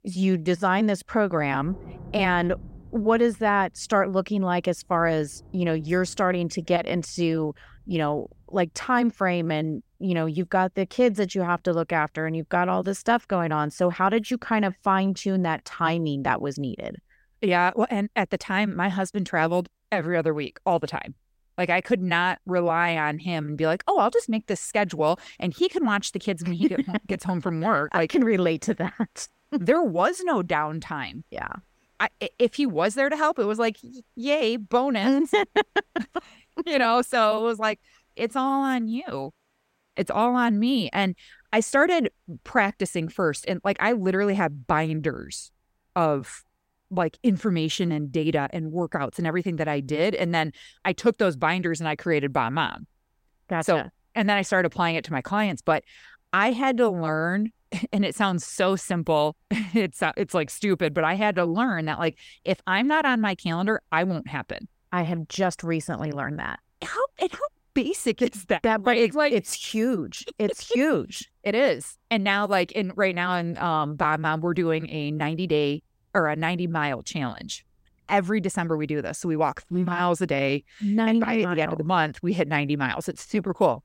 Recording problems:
rain or running water; faint; throughout; 30 dB below the speech

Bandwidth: 16 kHz